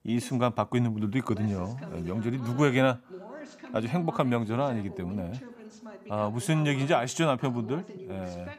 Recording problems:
voice in the background; noticeable; throughout; 15 dB below the speech

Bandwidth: 15.5 kHz